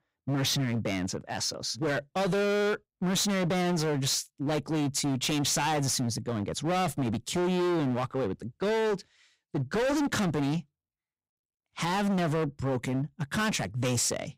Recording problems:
distortion; heavy; 25% of the sound clipped

